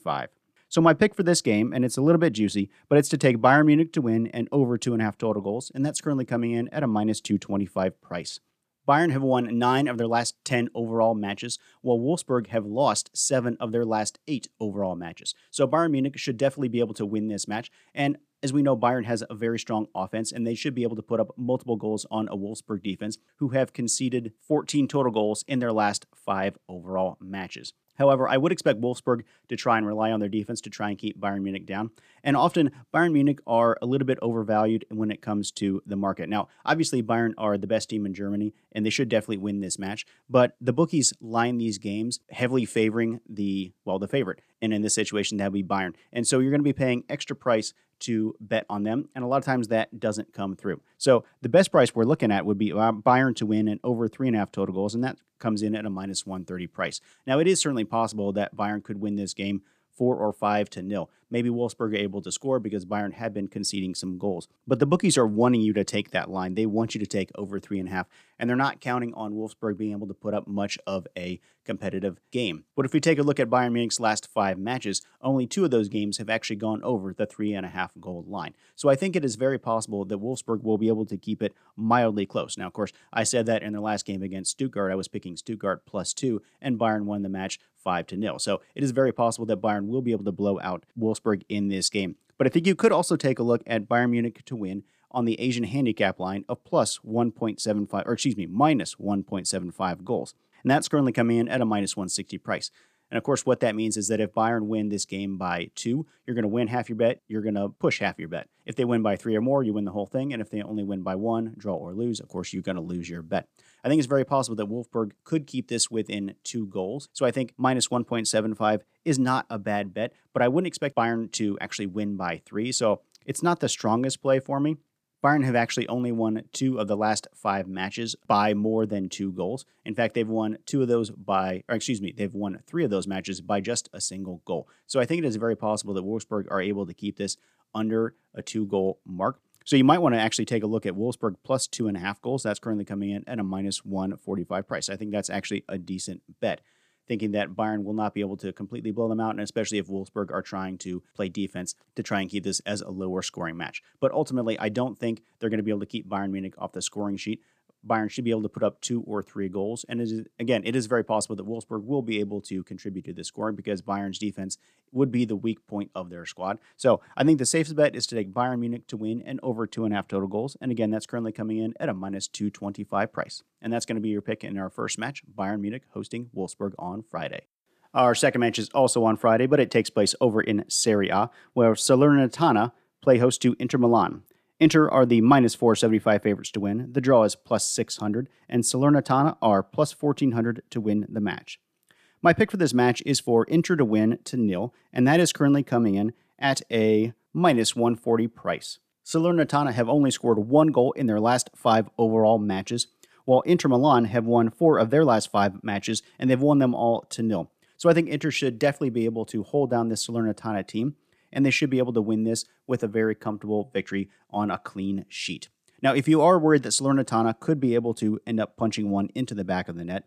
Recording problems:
none

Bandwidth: 14.5 kHz